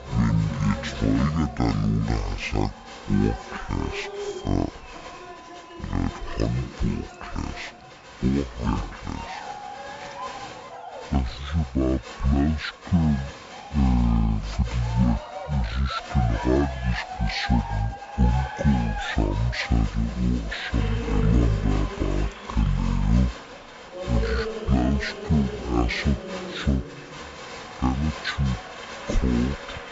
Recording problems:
wrong speed and pitch; too slow and too low; 0.5 times normal speed
crowd noise; noticeable; throughout; 10 dB below the speech

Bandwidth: 7.5 kHz